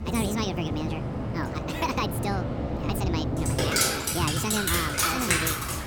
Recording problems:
wrong speed and pitch; too fast and too high; 1.6 times normal speed
rain or running water; very loud; throughout; 5 dB above the speech
background chatter; very faint; throughout; 4 voices, 25 dB below the speech

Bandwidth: 18.5 kHz